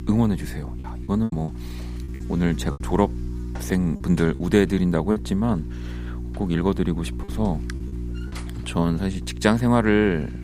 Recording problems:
electrical hum; noticeable; throughout; 60 Hz, 15 dB below the speech
choppy; very; from 1 to 3 s, from 4 to 5 s and at 7 s; 6% of the speech affected

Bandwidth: 15.5 kHz